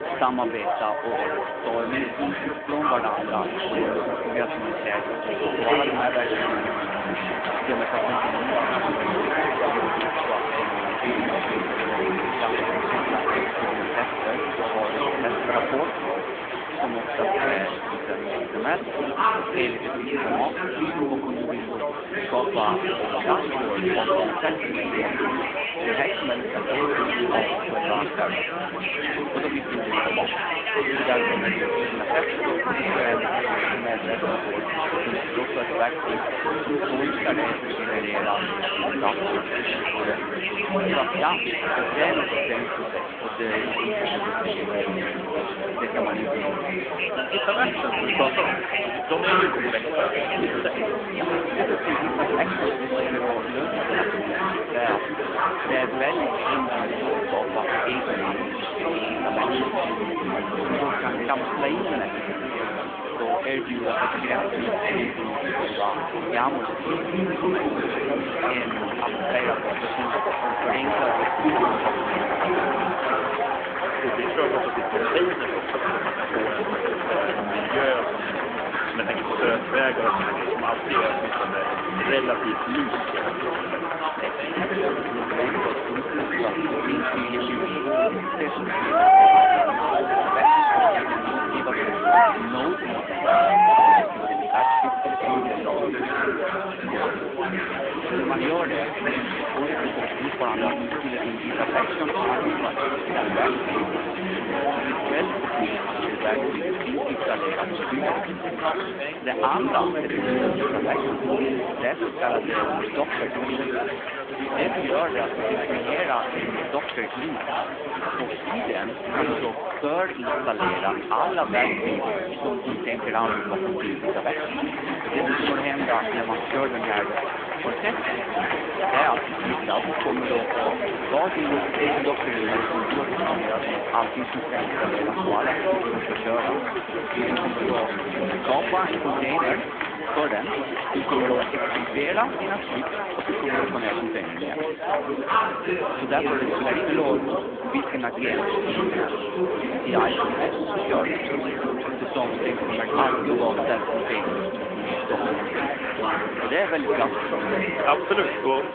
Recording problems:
phone-call audio; nothing above 3.5 kHz
chatter from many people; very loud; throughout; 4 dB above the speech
background music; loud; throughout; 7 dB below the speech
animal sounds; very faint; throughout; 25 dB below the speech

